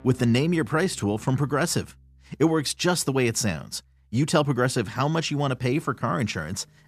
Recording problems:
background music; faint; throughout; 30 dB below the speech

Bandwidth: 14.5 kHz